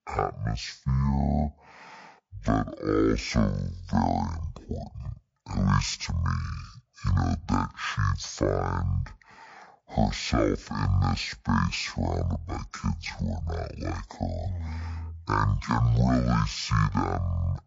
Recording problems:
wrong speed and pitch; too slow and too low; 0.5 times normal speed

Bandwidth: 7.5 kHz